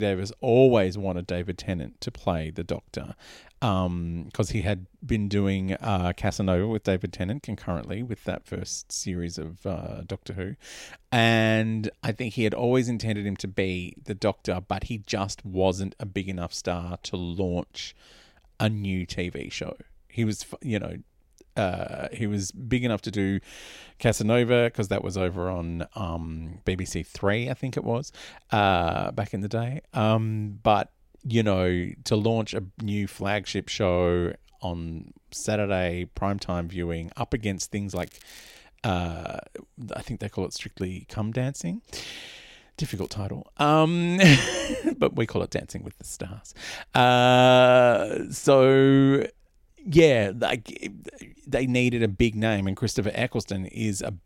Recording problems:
crackling; faint; at 38 s and at 43 s; 25 dB below the speech
abrupt cut into speech; at the start

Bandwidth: 16 kHz